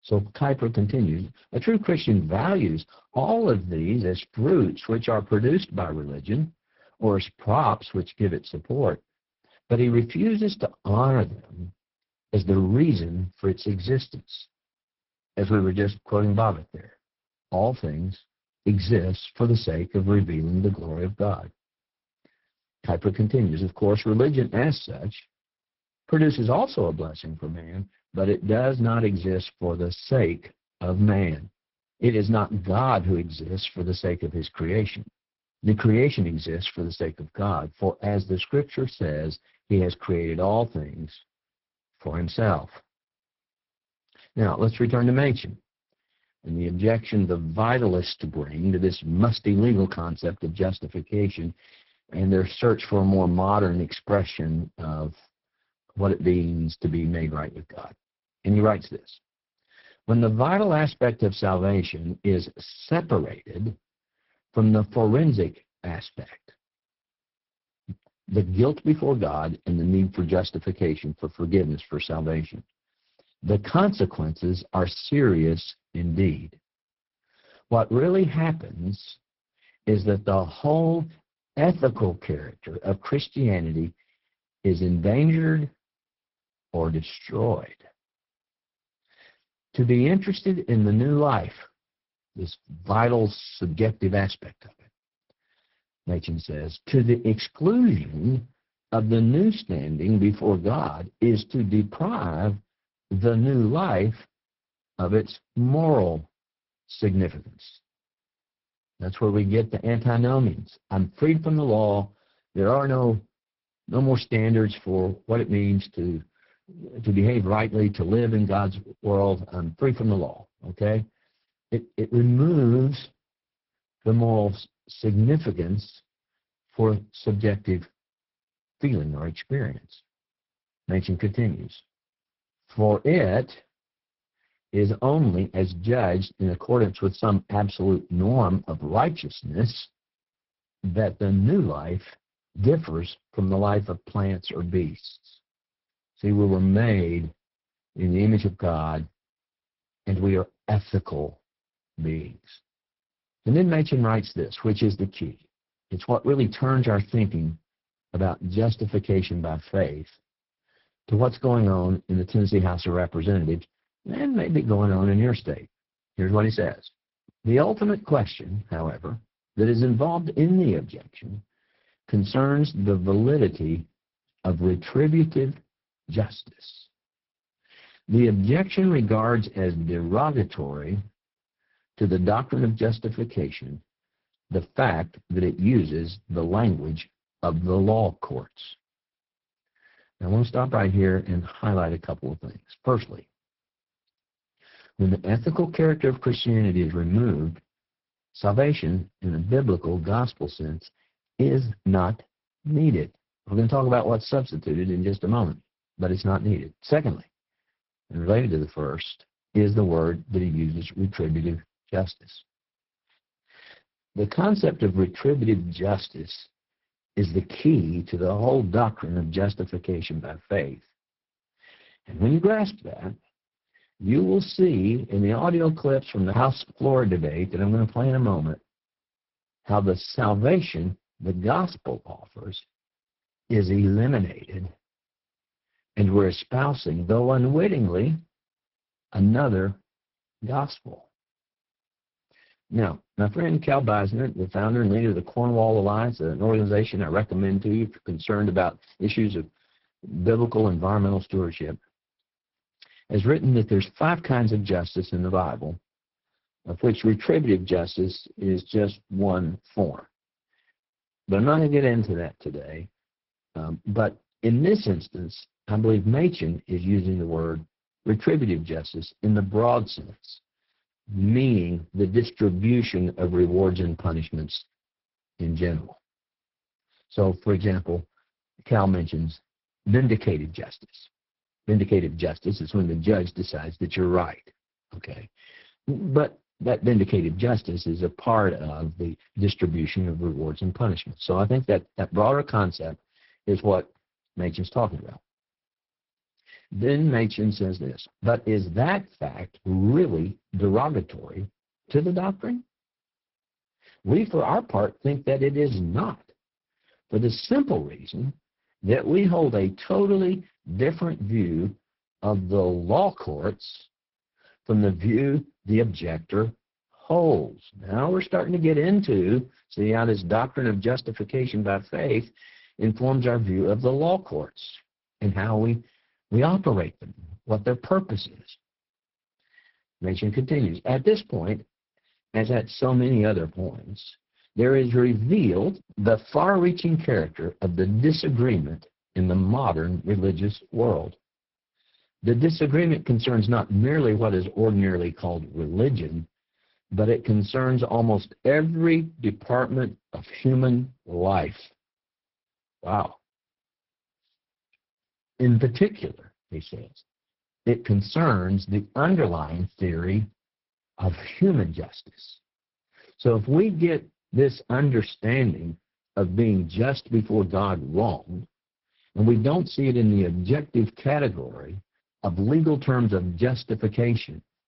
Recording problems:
garbled, watery; badly
high frequencies cut off; noticeable; nothing above 5.5 kHz

